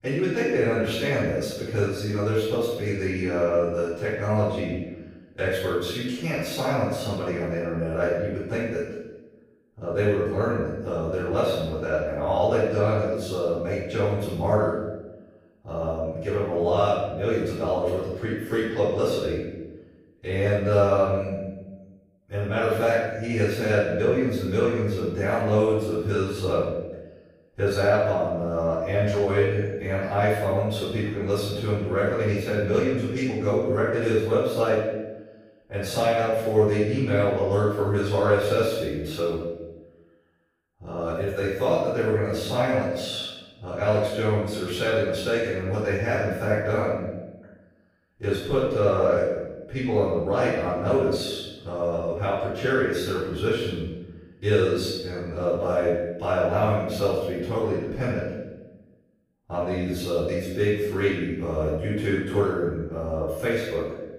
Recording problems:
room echo; strong; dies away in 0.9 s
off-mic speech; far

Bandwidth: 15.5 kHz